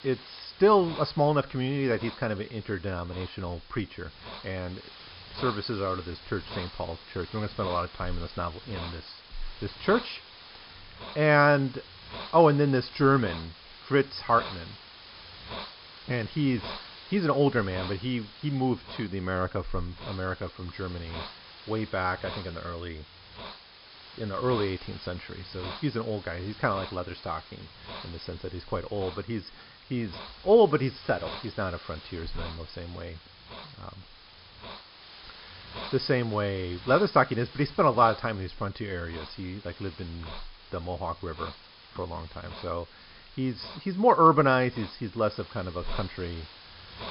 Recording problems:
high frequencies cut off; noticeable; nothing above 5.5 kHz
hiss; noticeable; throughout; 15 dB below the speech

